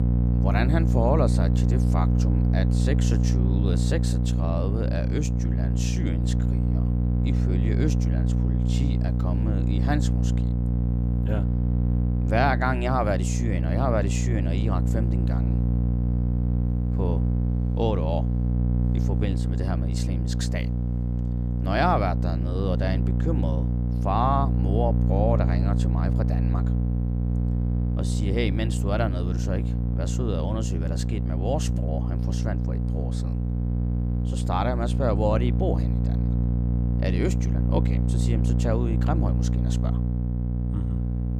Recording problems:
electrical hum; loud; throughout; 60 Hz, 5 dB below the speech

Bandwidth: 15 kHz